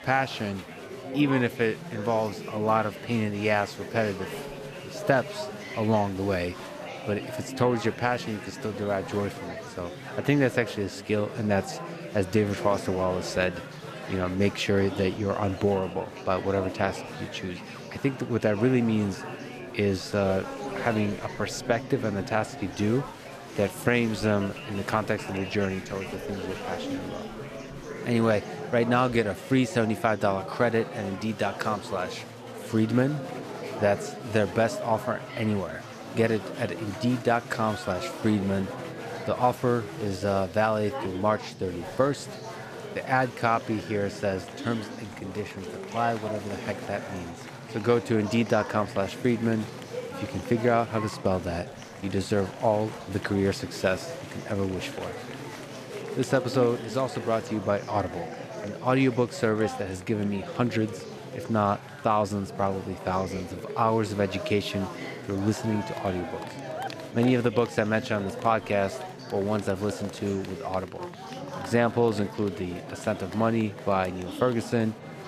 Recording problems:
chatter from many people; noticeable; throughout; 10 dB below the speech

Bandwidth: 14.5 kHz